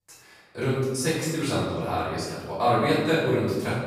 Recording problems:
room echo; strong; dies away in 1.2 s
off-mic speech; far

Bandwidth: 15.5 kHz